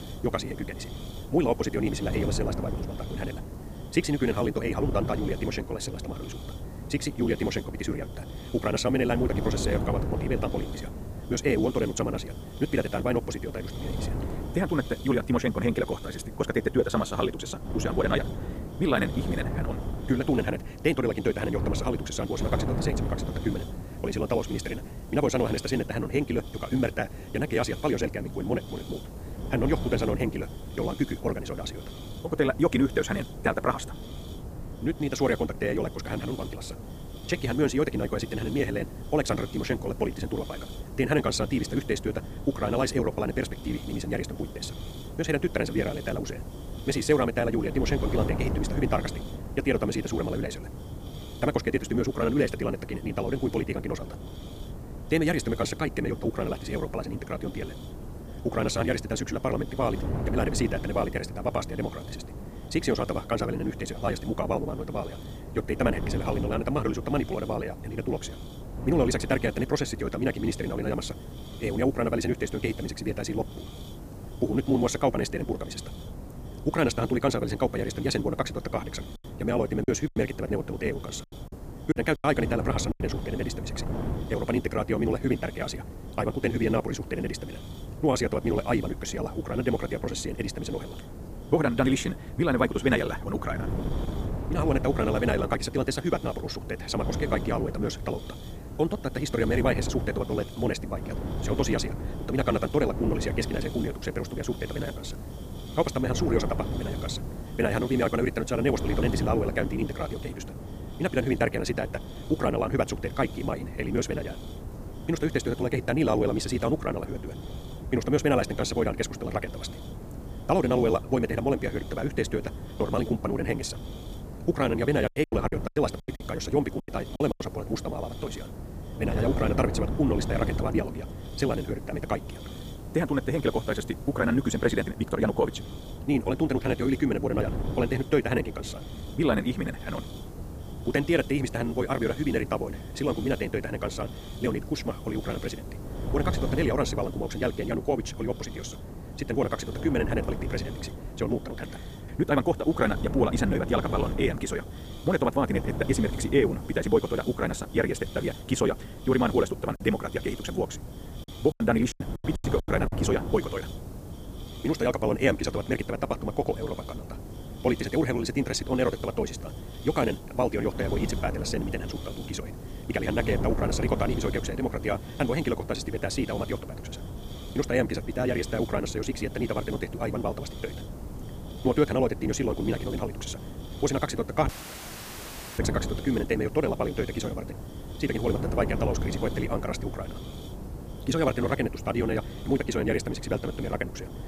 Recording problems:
wrong speed, natural pitch; too fast; 1.8 times normal speed
wind noise on the microphone; occasional gusts; 15 dB below the speech
hiss; faint; throughout; 20 dB below the speech
choppy; very; from 1:20 to 1:23, from 2:05 to 2:07 and from 2:42 to 2:43; 13% of the speech affected
audio cutting out; filled with static; at 3:04 for 1 s

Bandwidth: 15 kHz